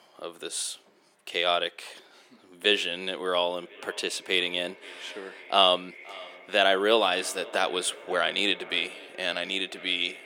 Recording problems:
thin; somewhat; fading below 350 Hz
echo of what is said; faint; from 3.5 s on; 530 ms later, 20 dB below the speech

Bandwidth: 17.5 kHz